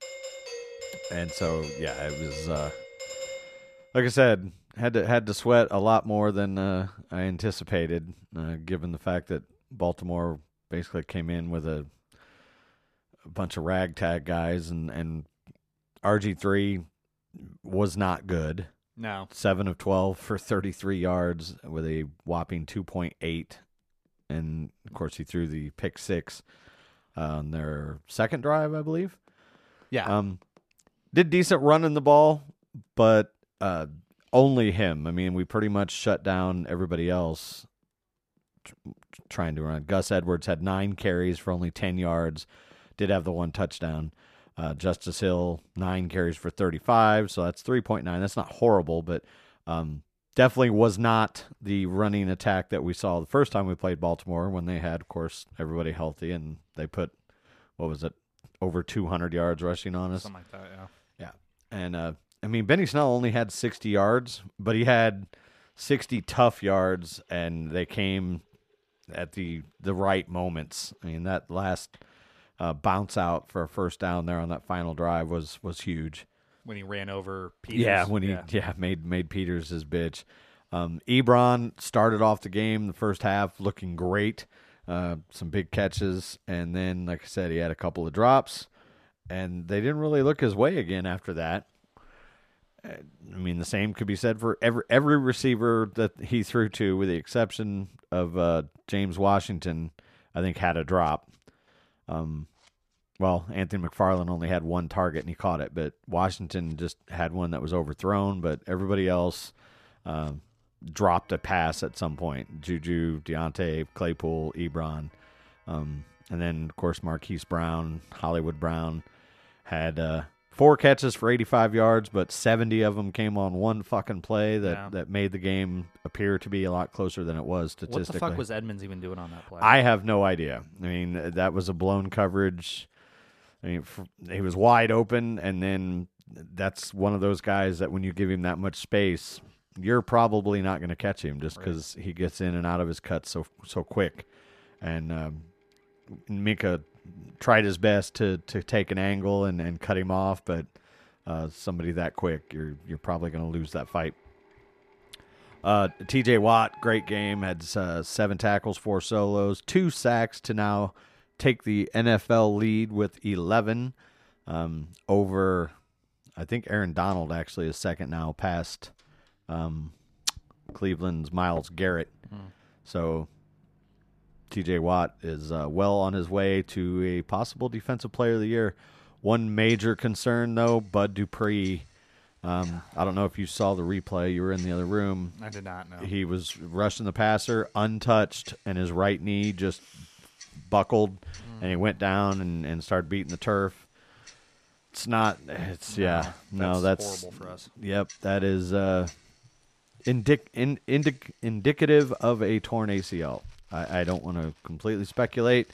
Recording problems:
household noises; faint; throughout; 30 dB below the speech
doorbell; noticeable; until 3.5 s; peak 9 dB below the speech

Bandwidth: 14.5 kHz